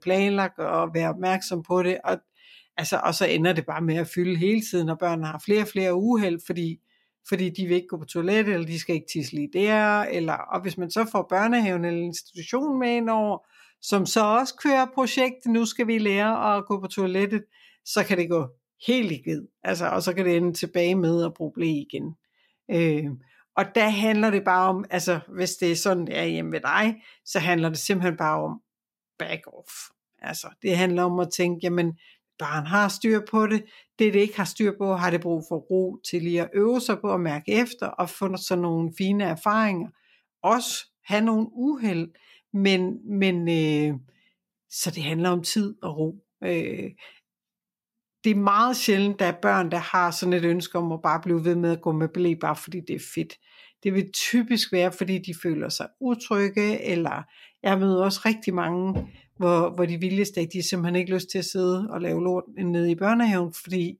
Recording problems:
none

